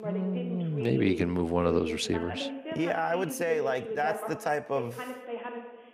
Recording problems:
voice in the background; loud; throughout; 8 dB below the speech

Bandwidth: 15 kHz